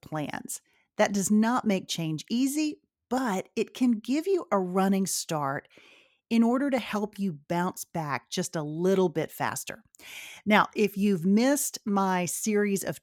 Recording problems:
none

